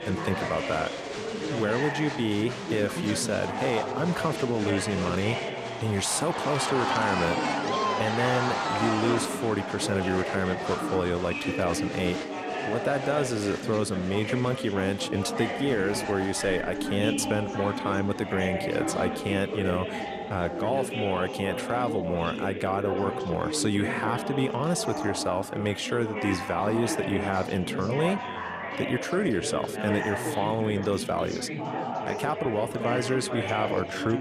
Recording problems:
chatter from many people; loud; throughout; 3 dB below the speech

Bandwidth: 14 kHz